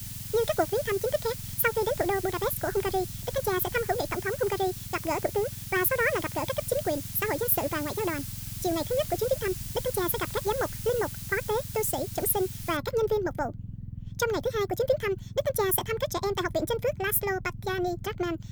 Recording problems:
wrong speed and pitch; too fast and too high; 1.7 times normal speed
hiss; loud; until 13 s; 10 dB below the speech
low rumble; faint; throughout; 25 dB below the speech

